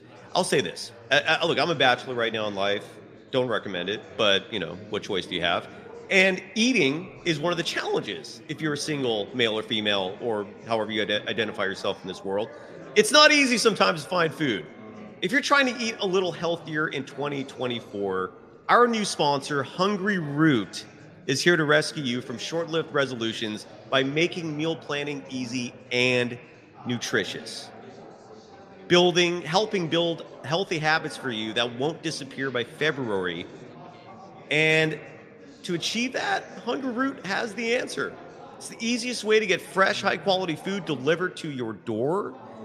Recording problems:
echo of what is said; faint; throughout; 90 ms later, 25 dB below the speech
chatter from many people; faint; throughout; 20 dB below the speech

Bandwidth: 15 kHz